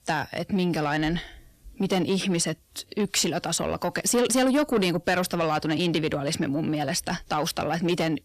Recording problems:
distortion; slight; 10 dB below the speech

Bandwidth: 14.5 kHz